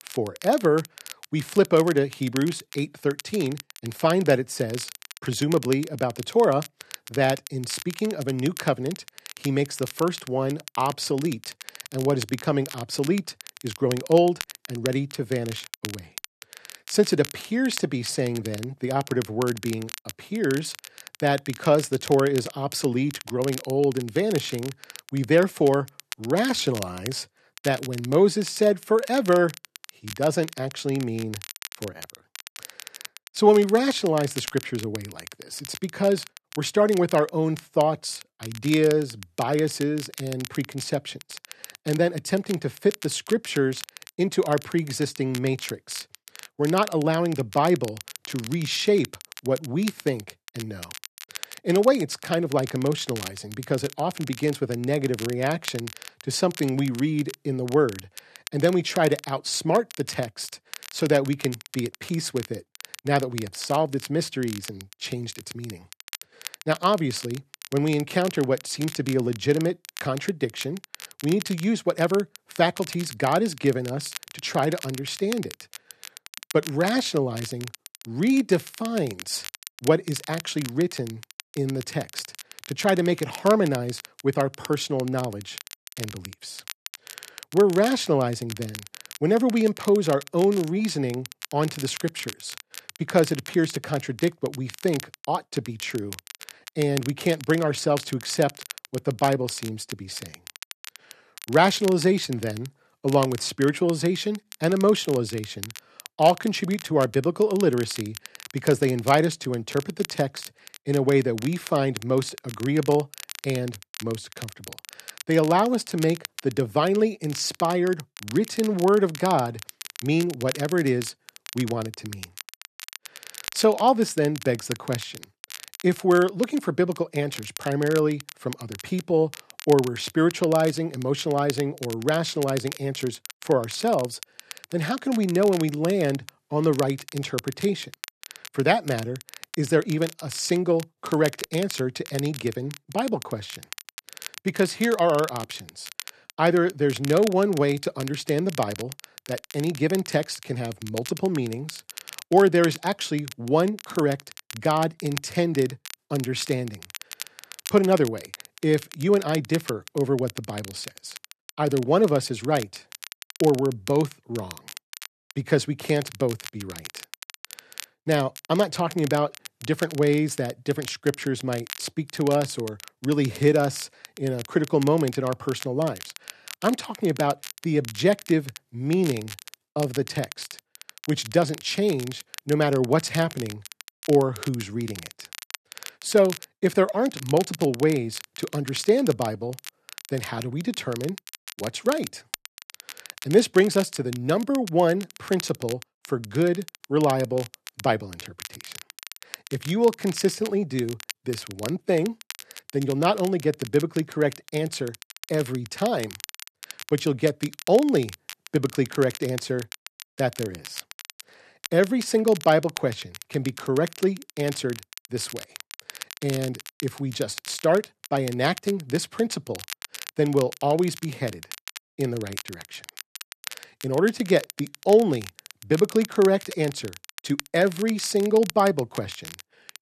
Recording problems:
crackle, like an old record; noticeable; 15 dB below the speech

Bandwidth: 13.5 kHz